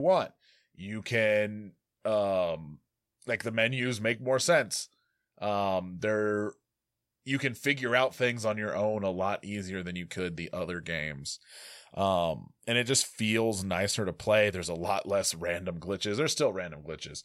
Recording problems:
abrupt cut into speech; at the start

